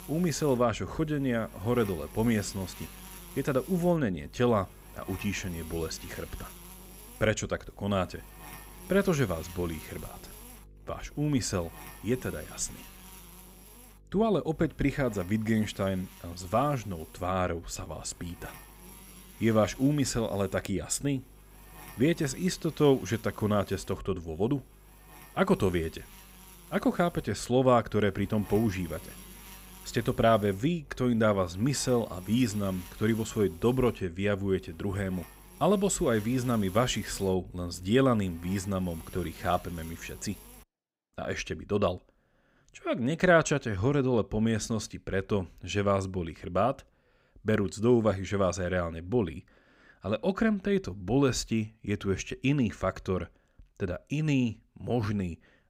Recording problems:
electrical hum; faint; until 41 s; 50 Hz, 20 dB below the speech

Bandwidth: 15.5 kHz